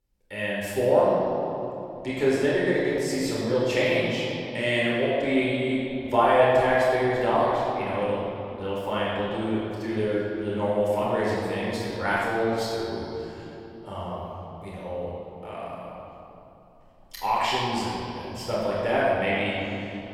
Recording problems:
room echo; strong; dies away in 2.8 s
off-mic speech; far

